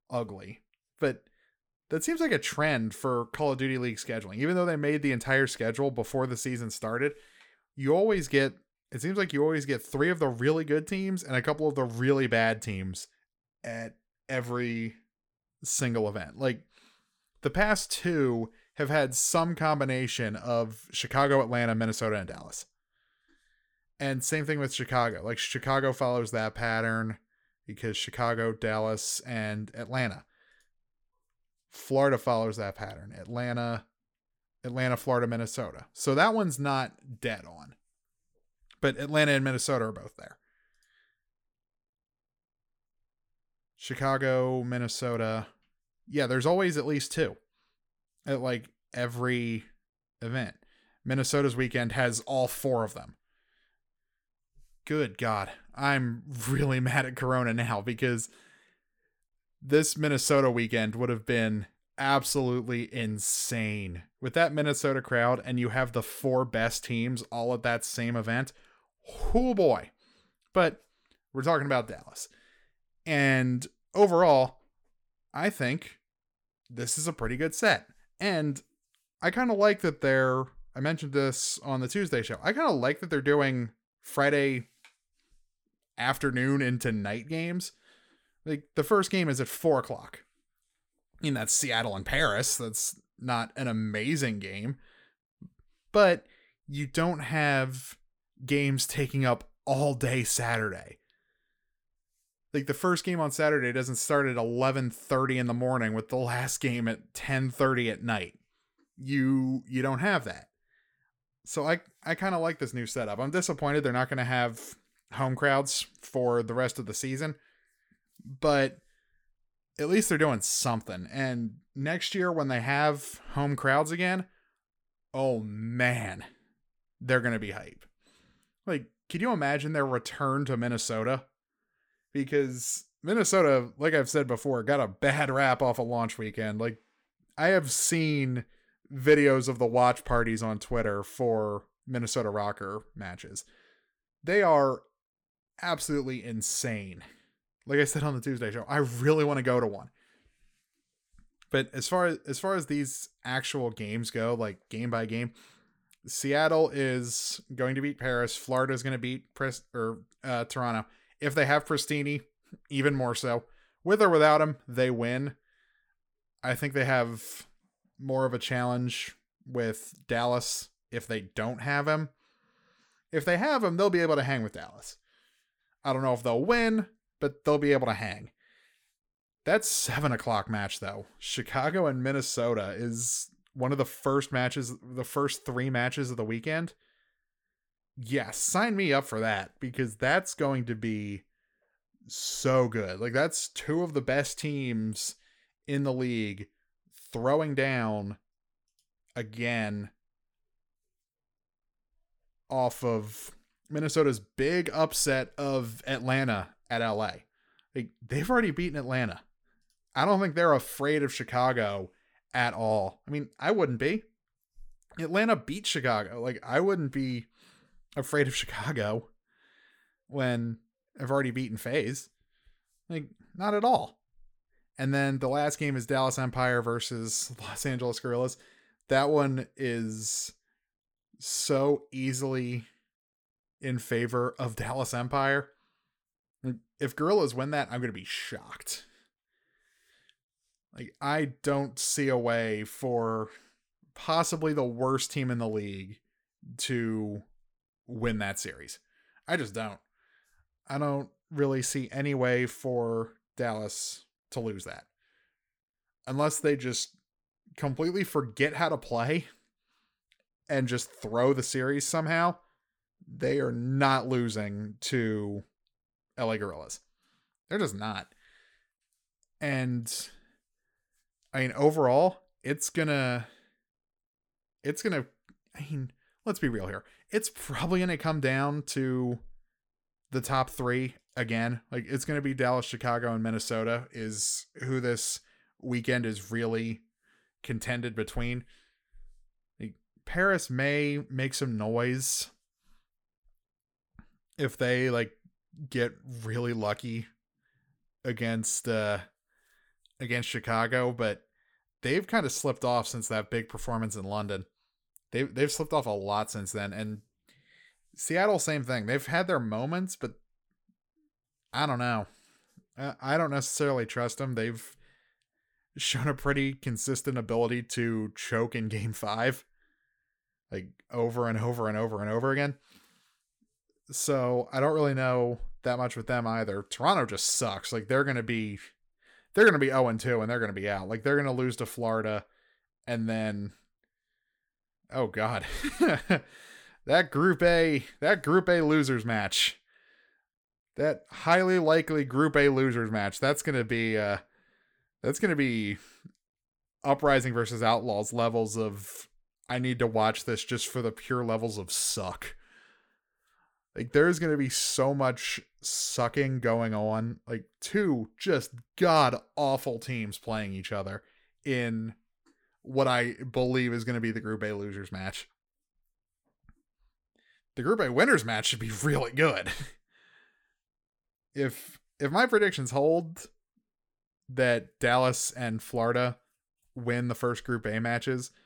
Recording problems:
none

